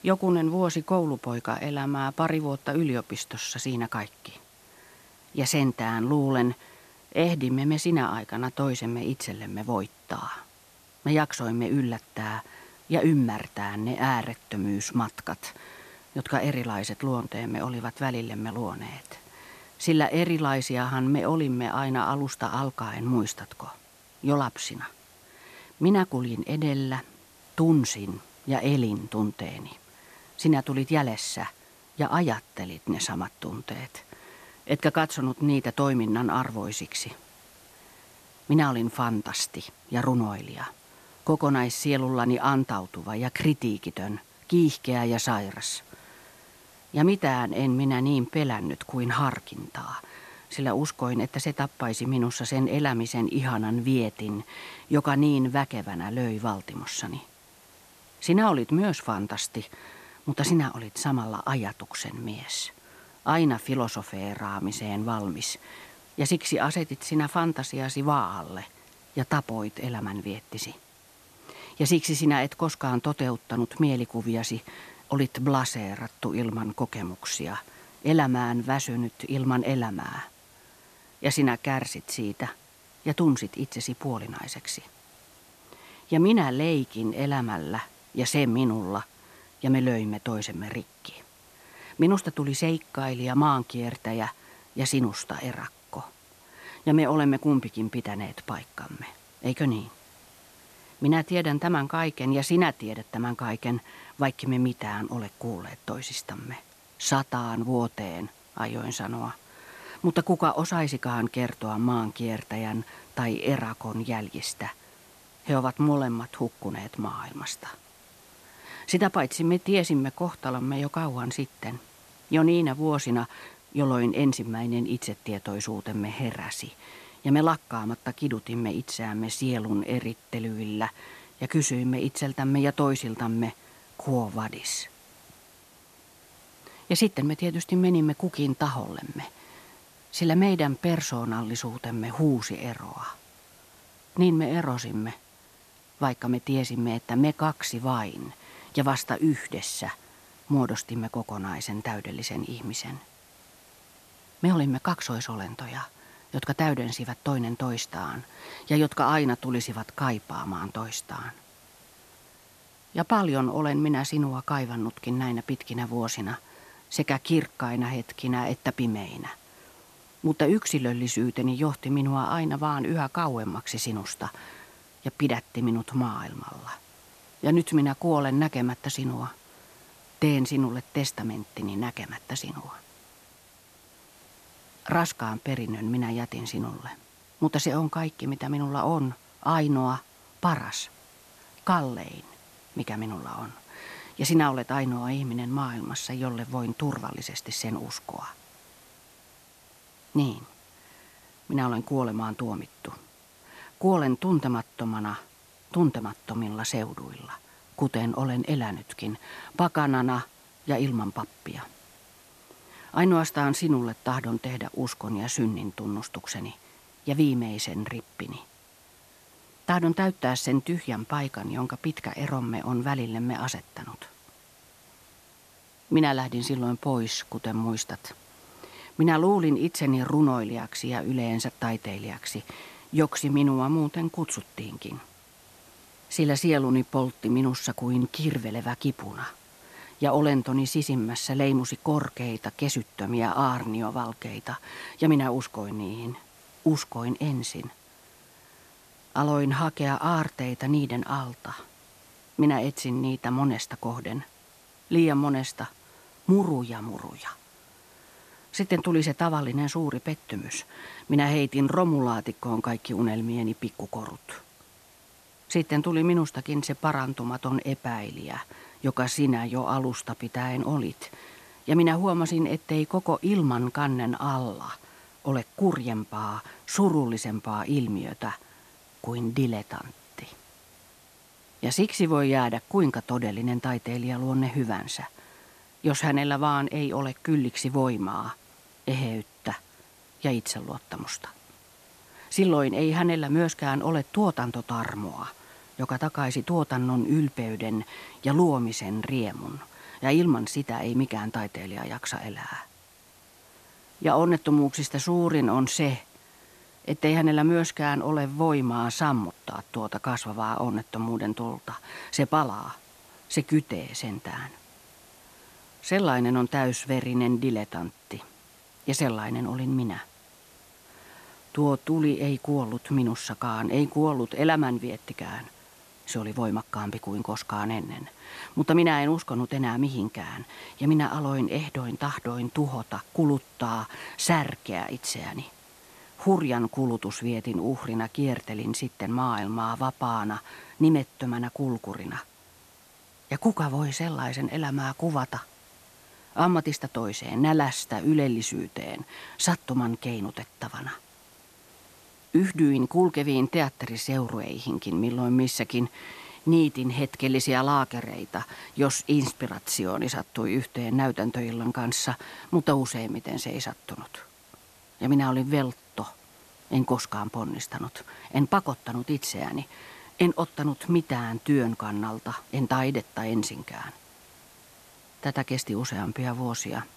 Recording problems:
hiss; faint; throughout; 25 dB below the speech

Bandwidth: 14 kHz